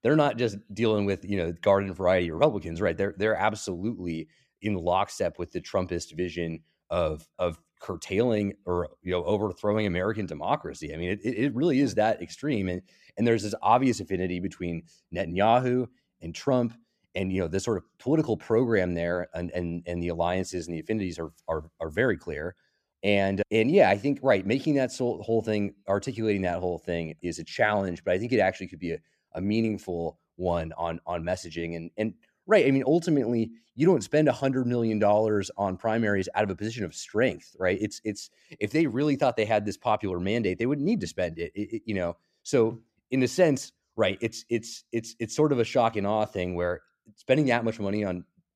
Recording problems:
none

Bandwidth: 14.5 kHz